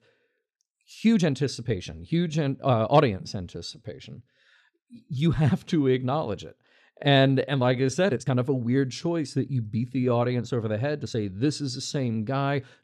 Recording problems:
uneven, jittery; strongly; from 1 to 12 s

